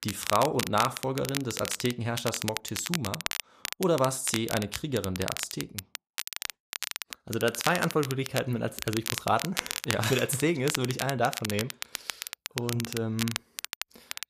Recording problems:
crackle, like an old record; loud; 5 dB below the speech

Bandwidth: 14.5 kHz